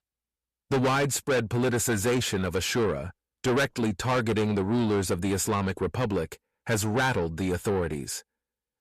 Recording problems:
distortion; heavy; 6 dB below the speech

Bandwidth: 14 kHz